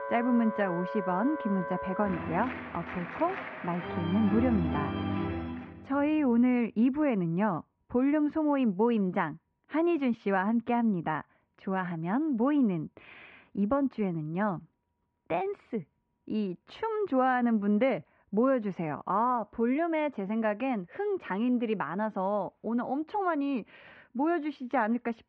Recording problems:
muffled; very; fading above 2.5 kHz
background music; loud; until 5.5 s; 6 dB below the speech

